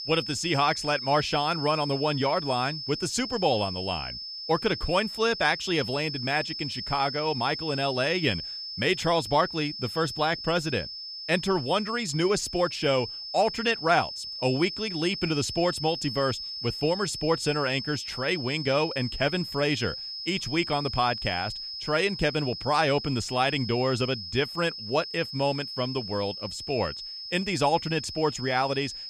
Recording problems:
high-pitched whine; loud; throughout; 5 kHz, 7 dB below the speech

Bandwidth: 15 kHz